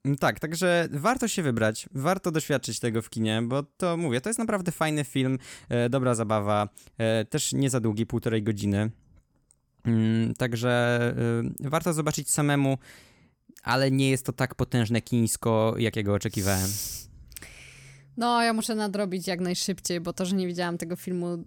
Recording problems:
none

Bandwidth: 18 kHz